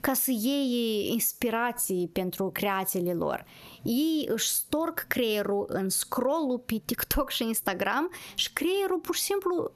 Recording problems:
squashed, flat; somewhat

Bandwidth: 13.5 kHz